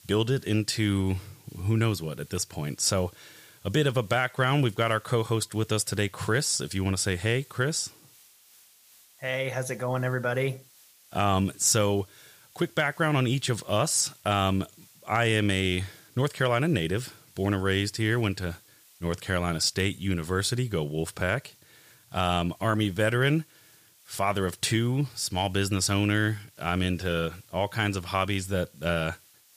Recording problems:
hiss; faint; throughout; 25 dB below the speech

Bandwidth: 15 kHz